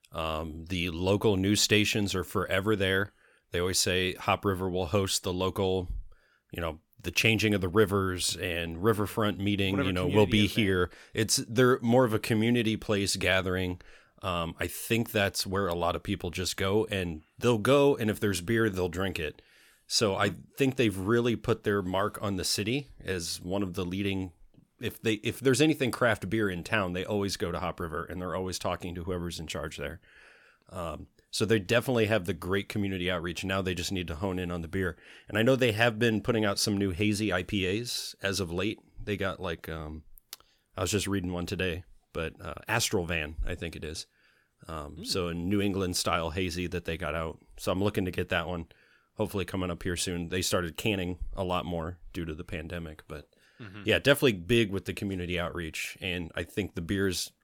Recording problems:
none

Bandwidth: 17.5 kHz